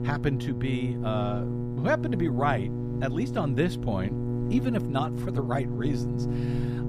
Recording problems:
electrical hum; loud; throughout; 60 Hz, 6 dB below the speech

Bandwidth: 14.5 kHz